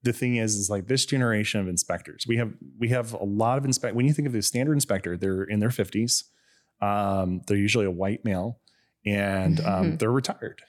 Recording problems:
none

